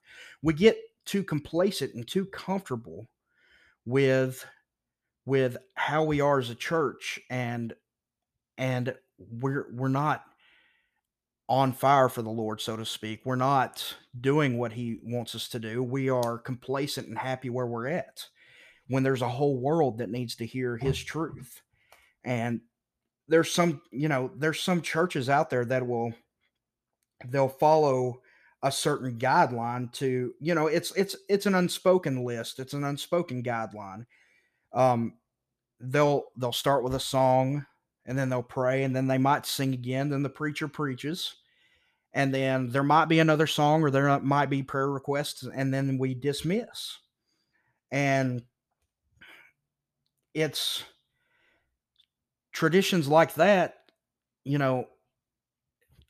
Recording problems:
none

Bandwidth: 14.5 kHz